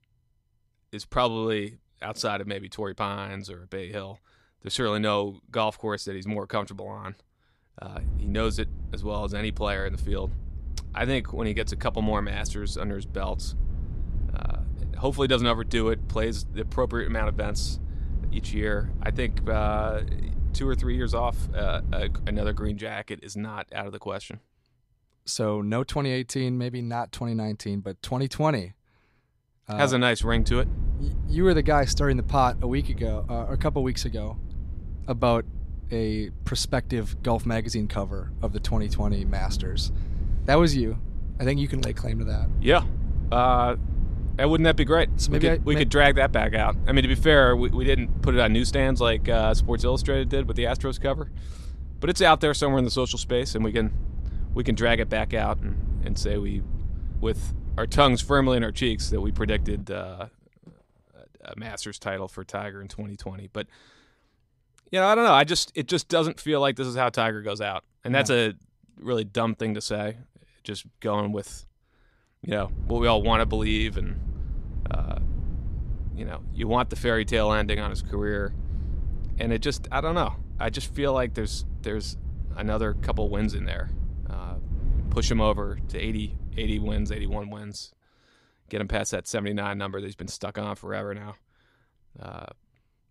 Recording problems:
low rumble; faint; from 8 to 23 s, from 30 s to 1:00 and from 1:13 to 1:27; 20 dB below the speech

